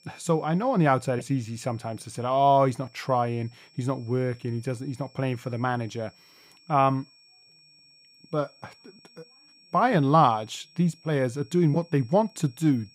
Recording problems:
high-pitched whine; faint; throughout; 5.5 kHz, 30 dB below the speech

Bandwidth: 15.5 kHz